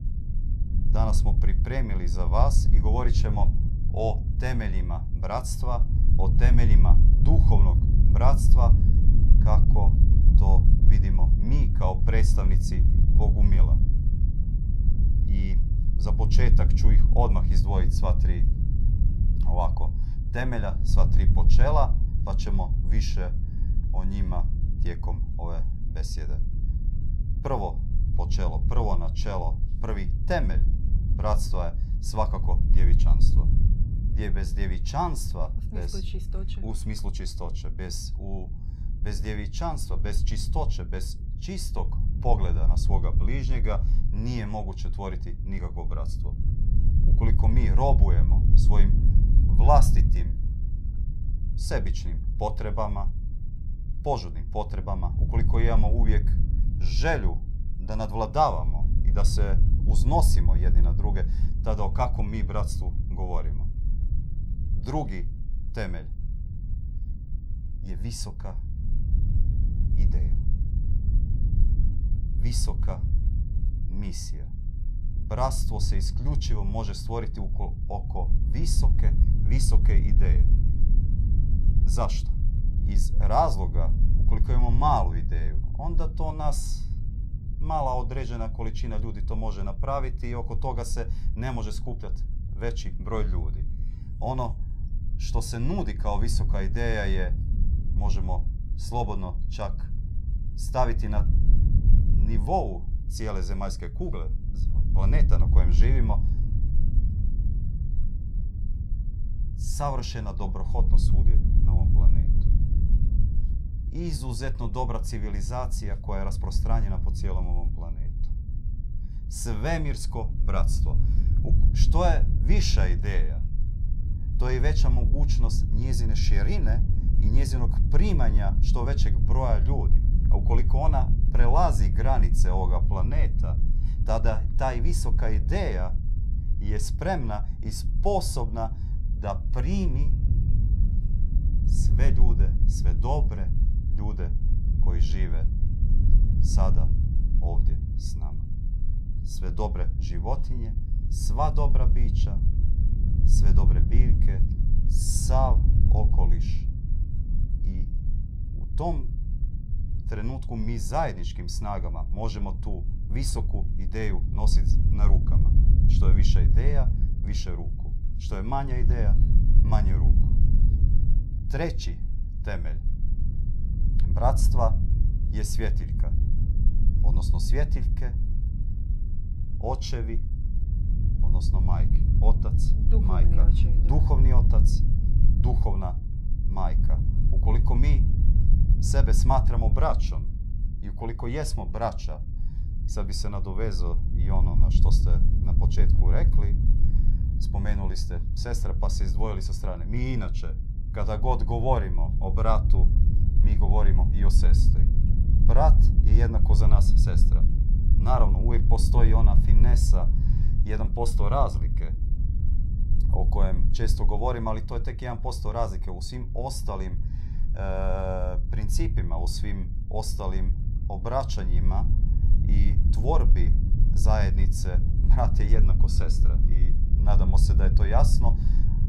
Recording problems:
low rumble; noticeable; throughout; 10 dB below the speech

